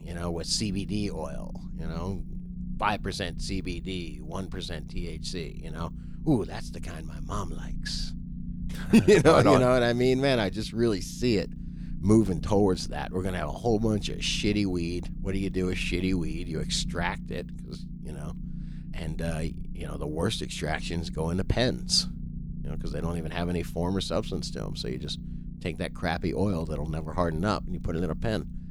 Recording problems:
low rumble; noticeable; throughout; 20 dB below the speech

